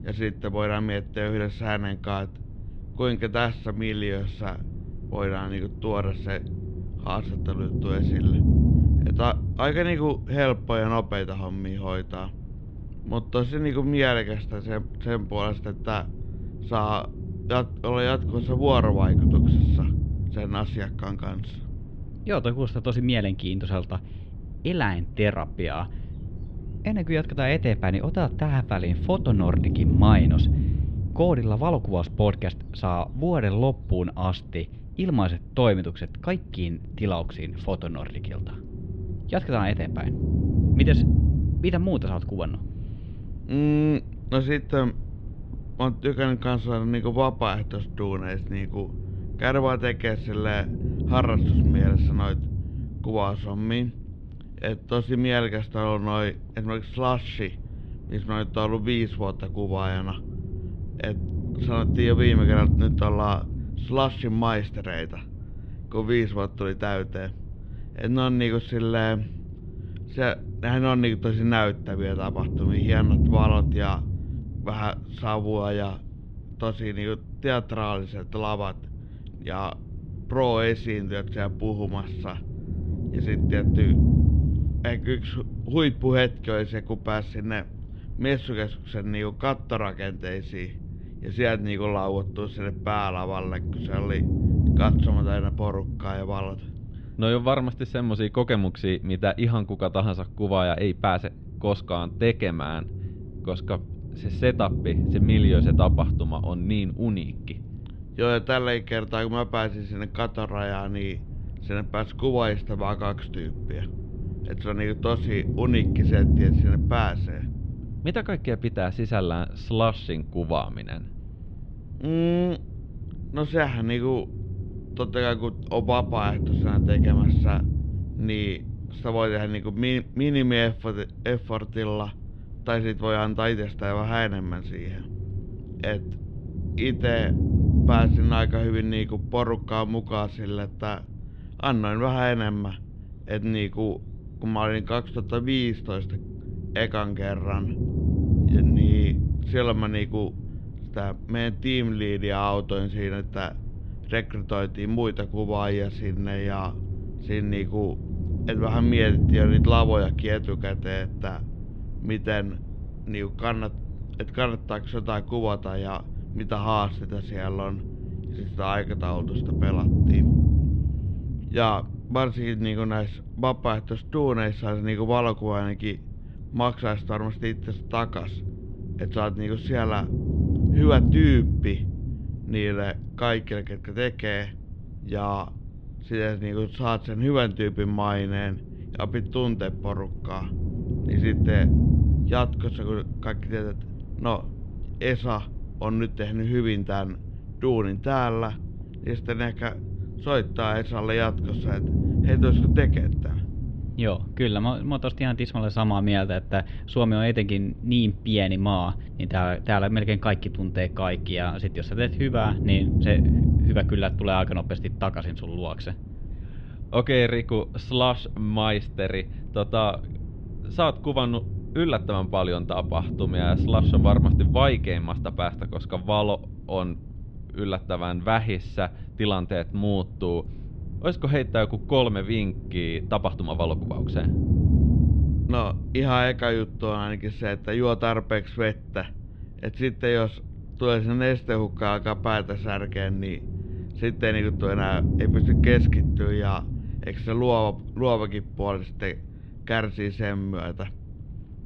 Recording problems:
muffled; slightly; fading above 3.5 kHz
low rumble; loud; throughout; 10 dB below the speech

